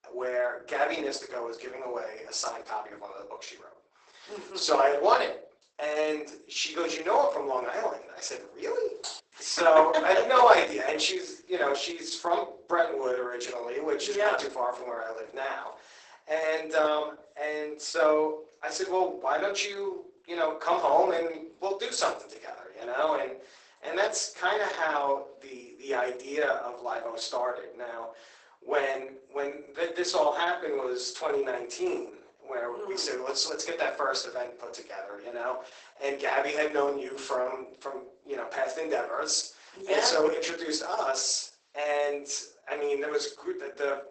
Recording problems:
garbled, watery; badly; nothing above 8 kHz
thin; very; fading below 350 Hz
room echo; slight; dies away in 0.4 s
off-mic speech; somewhat distant
keyboard typing; faint; at 9 s; peak 10 dB below the speech

